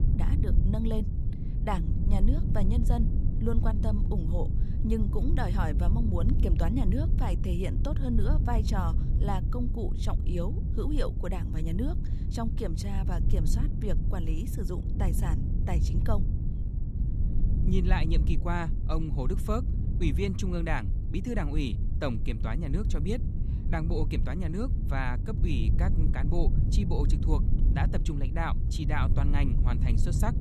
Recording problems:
low rumble; loud; throughout; 7 dB below the speech

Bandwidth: 13.5 kHz